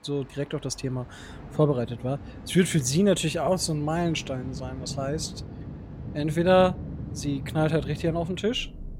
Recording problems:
rain or running water; noticeable; throughout; 10 dB below the speech

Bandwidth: 16 kHz